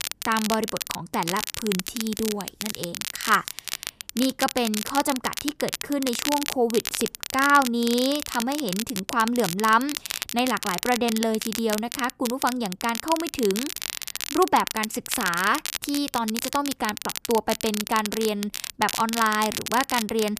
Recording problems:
crackle, like an old record; loud; 5 dB below the speech

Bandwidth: 14.5 kHz